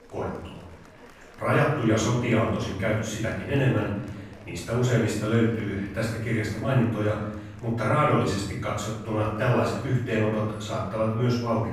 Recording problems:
off-mic speech; far
room echo; noticeable; dies away in 0.9 s
murmuring crowd; faint; throughout; 25 dB below the speech

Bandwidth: 15.5 kHz